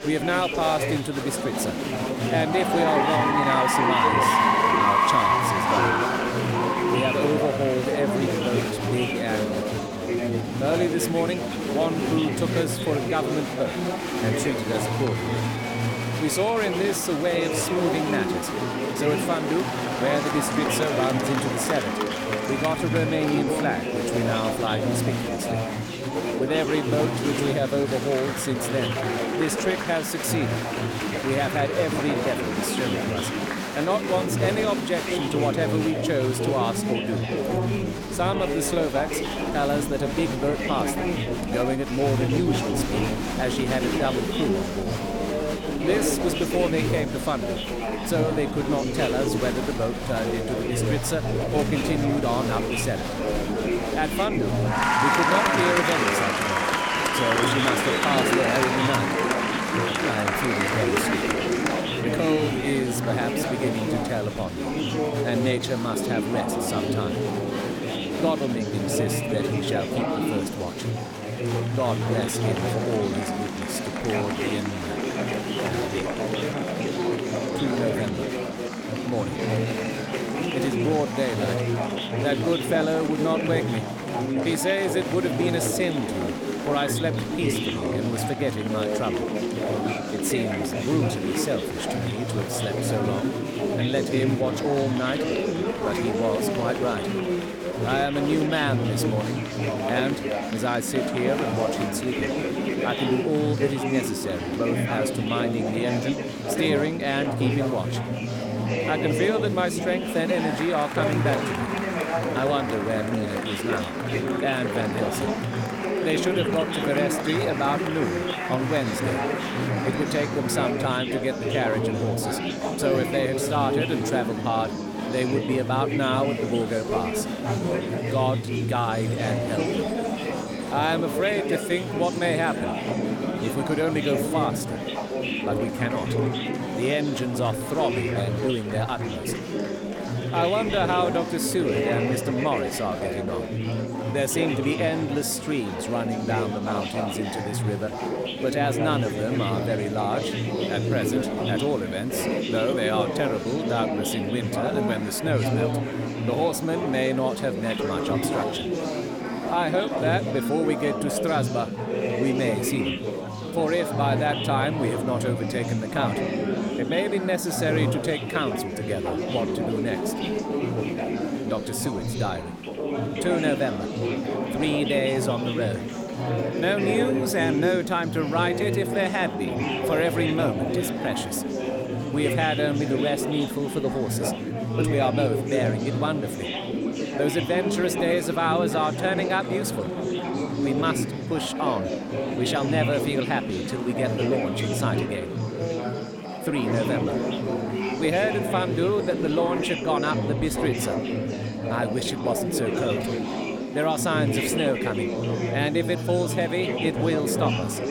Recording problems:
chatter from many people; very loud; throughout; 1 dB above the speech

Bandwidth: 18.5 kHz